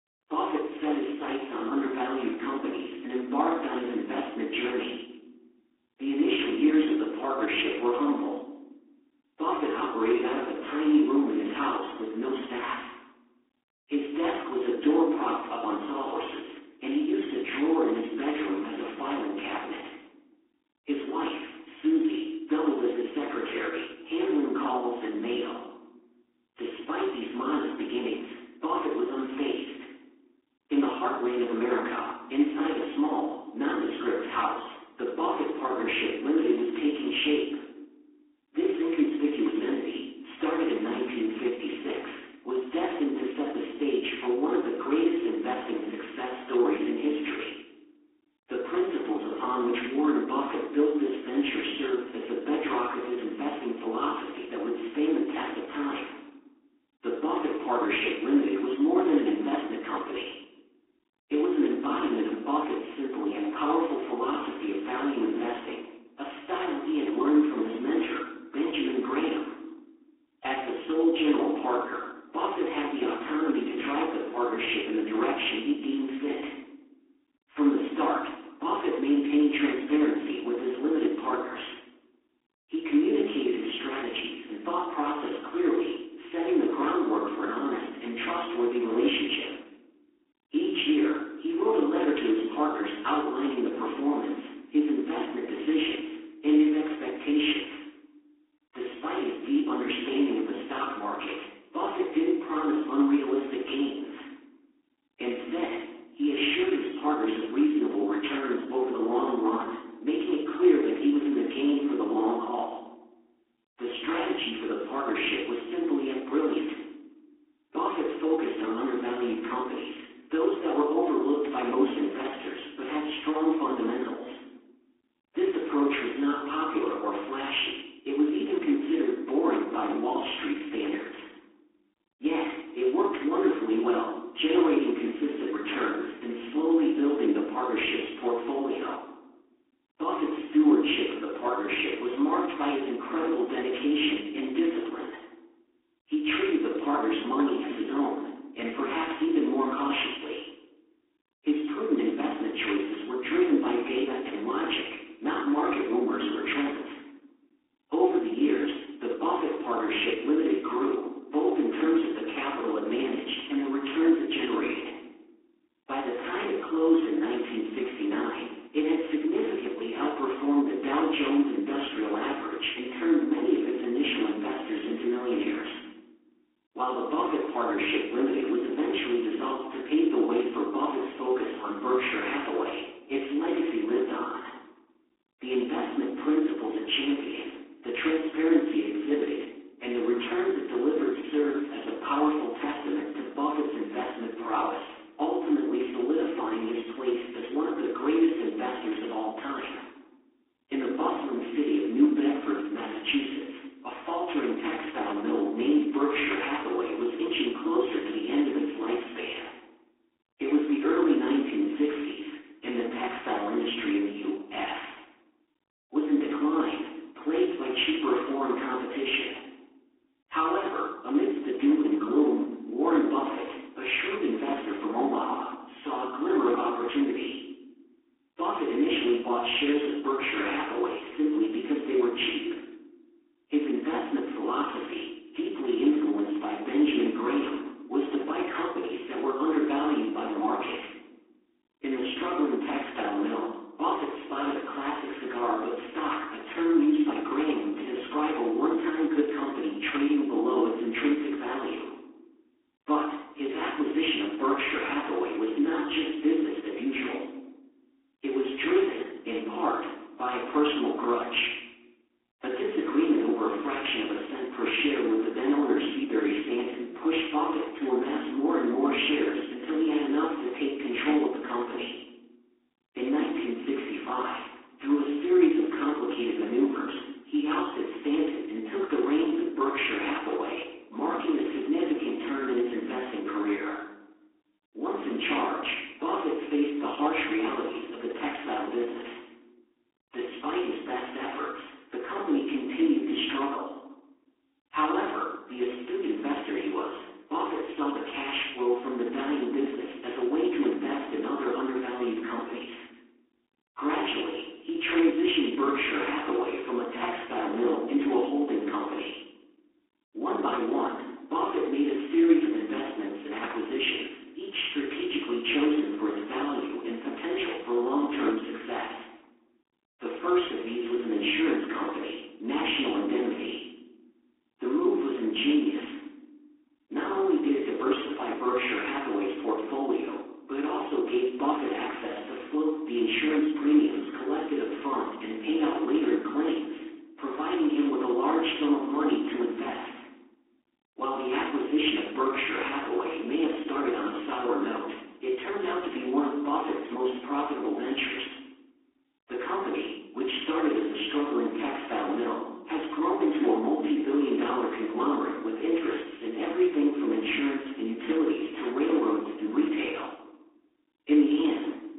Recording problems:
phone-call audio; poor line; nothing above 3.5 kHz
off-mic speech; far
garbled, watery; badly
room echo; noticeable; dies away in 0.7 s

